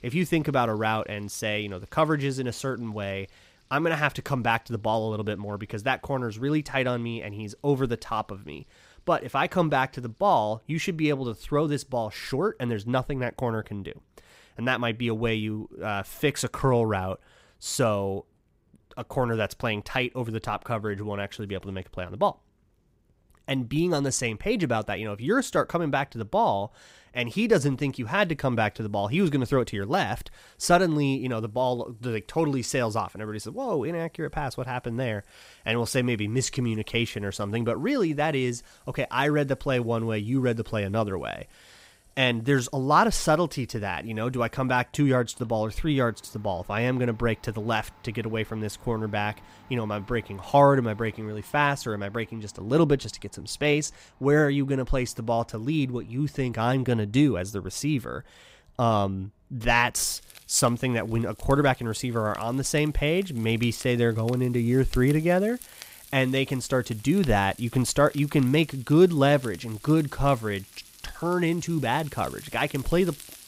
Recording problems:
household noises; faint; throughout; 25 dB below the speech

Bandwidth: 15.5 kHz